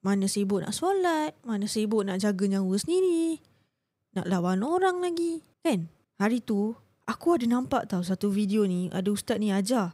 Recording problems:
none

